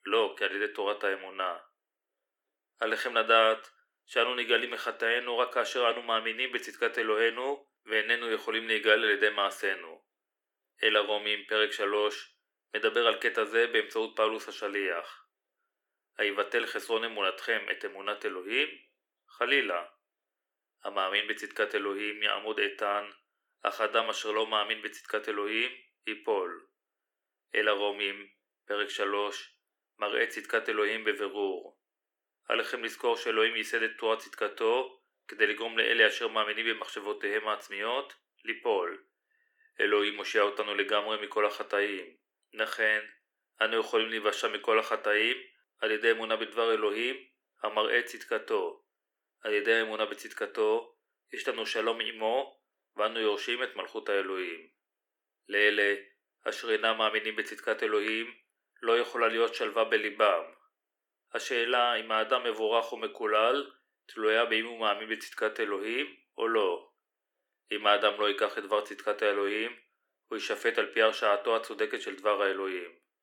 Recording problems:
thin; very; fading below 350 Hz

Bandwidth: 18.5 kHz